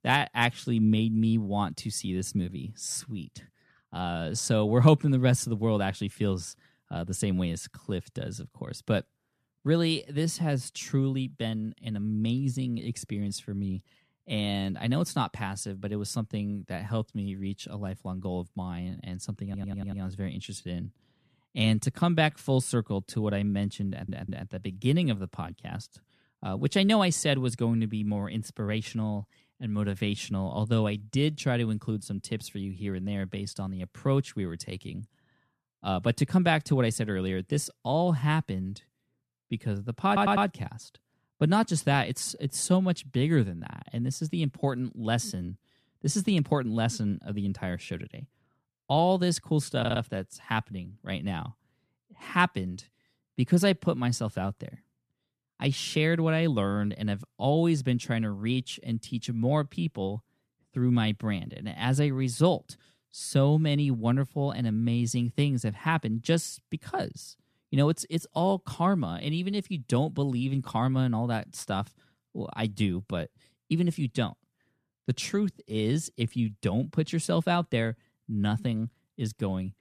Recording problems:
audio stuttering; 4 times, first at 19 s

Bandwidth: 14 kHz